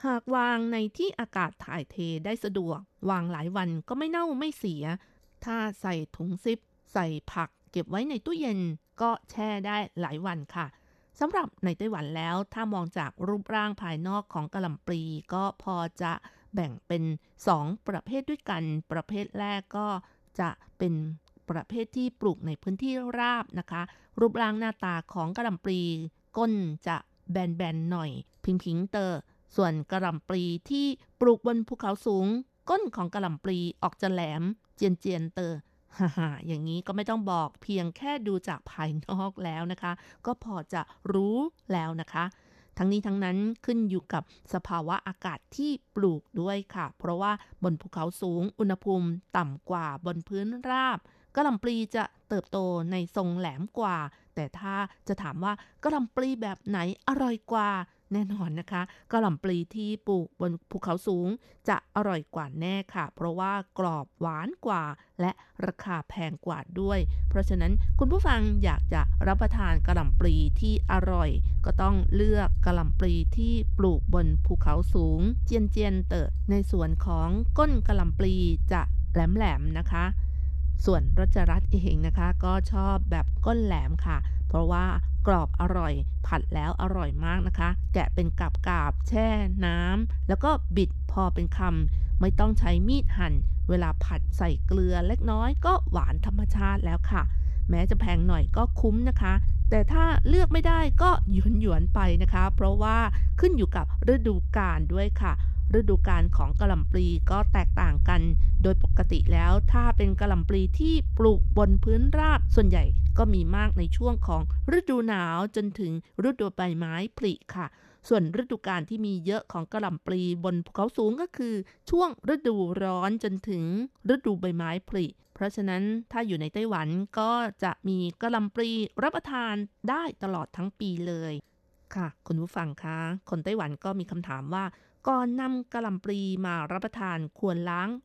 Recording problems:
low rumble; noticeable; from 1:07 to 1:55; 15 dB below the speech

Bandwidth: 13.5 kHz